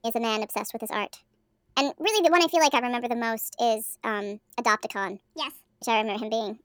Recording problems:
wrong speed and pitch; too fast and too high; 1.5 times normal speed

